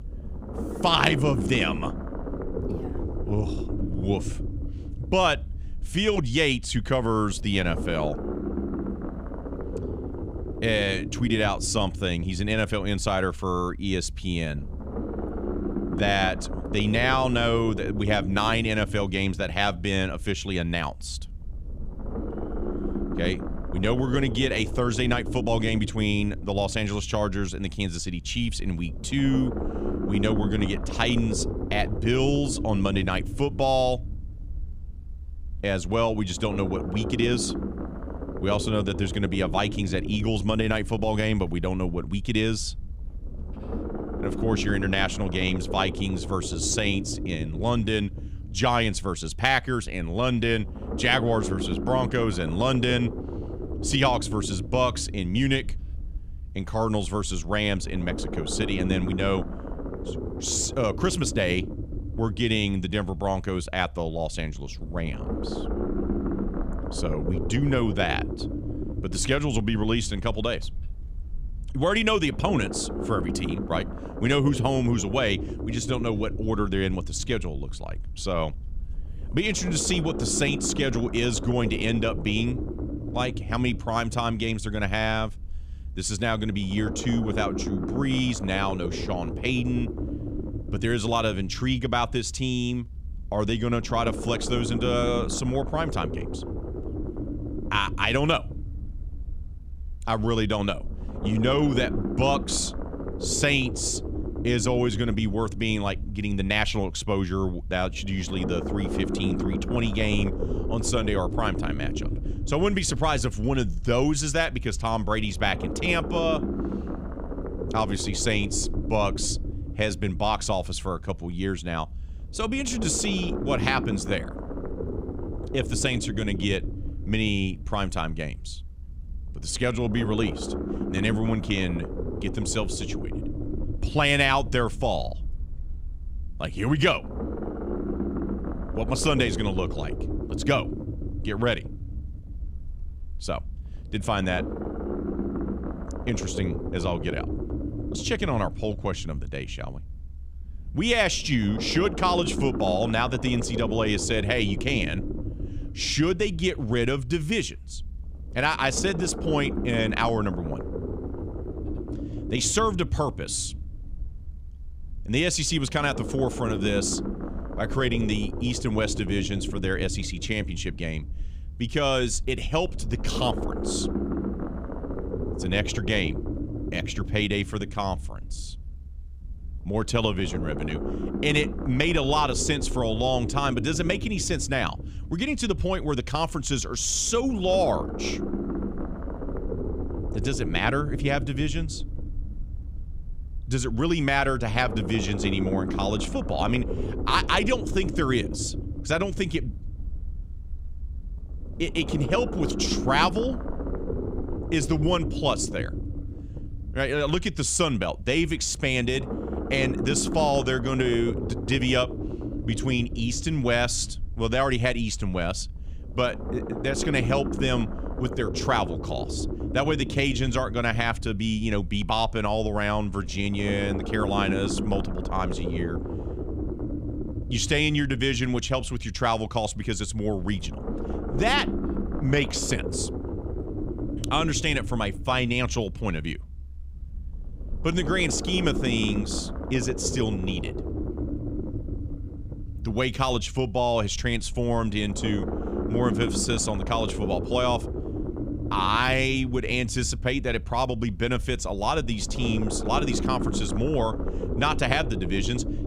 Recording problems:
low rumble; noticeable; throughout; 10 dB below the speech

